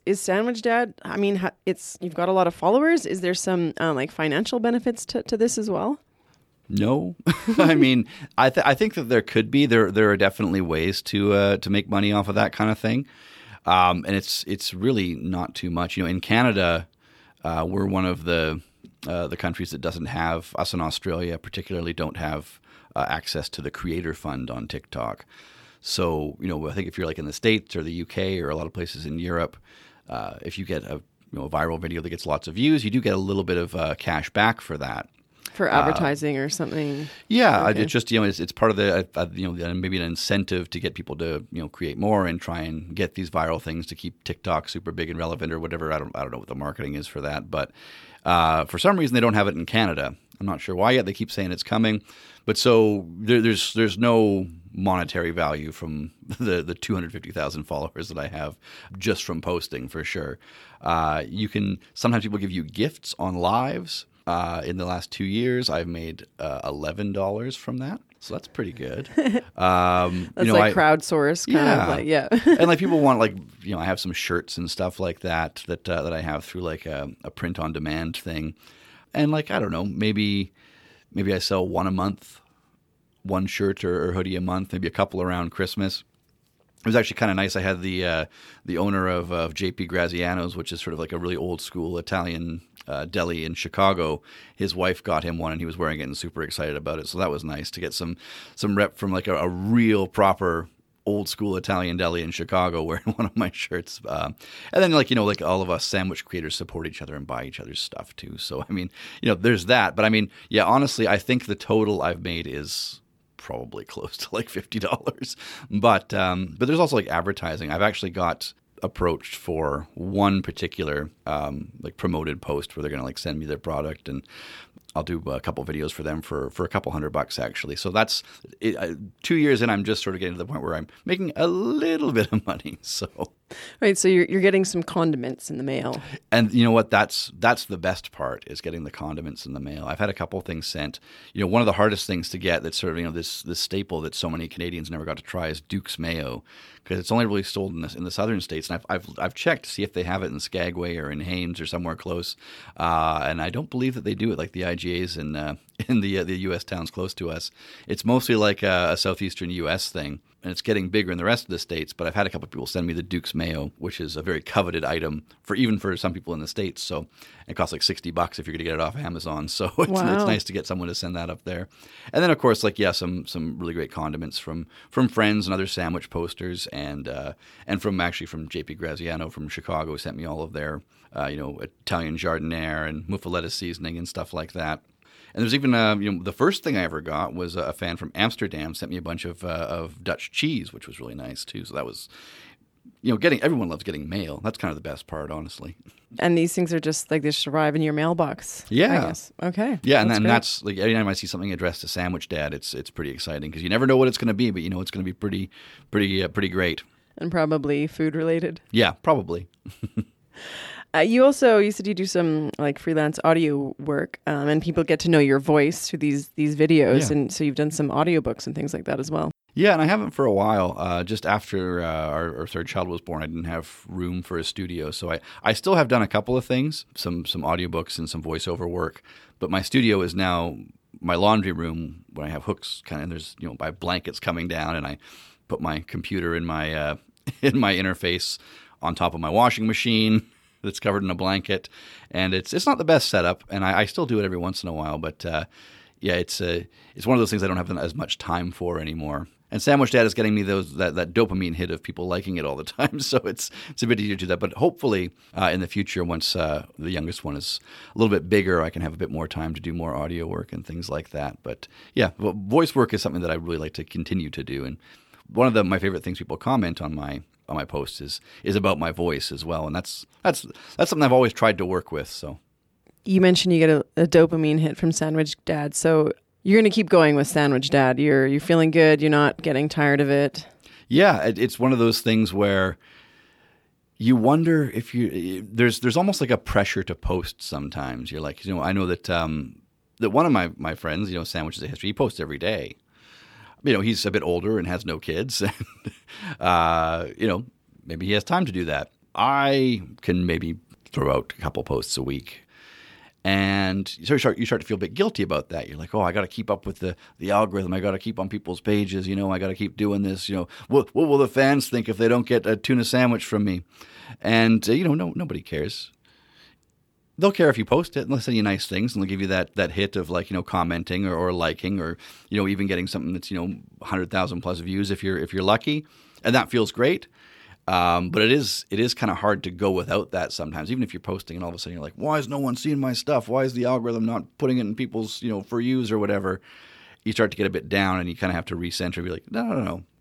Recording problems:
none

